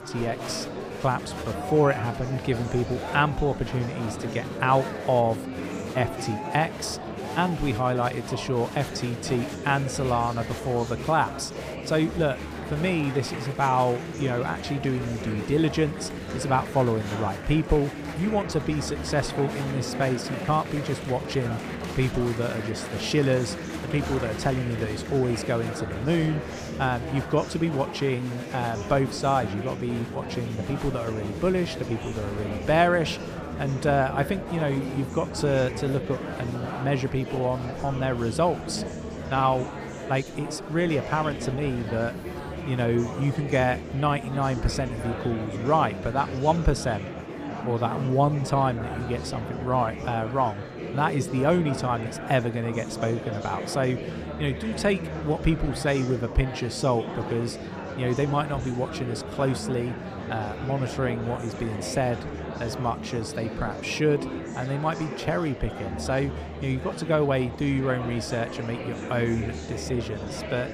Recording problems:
murmuring crowd; loud; throughout; 7 dB below the speech

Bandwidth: 15 kHz